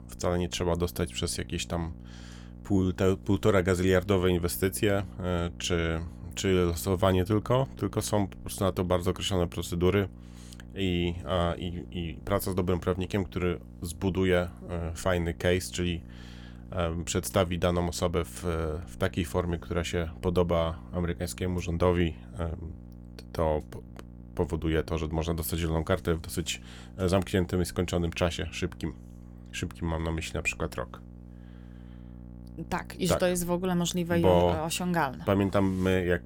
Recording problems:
electrical hum; faint; throughout; 60 Hz, 25 dB below the speech

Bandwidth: 18 kHz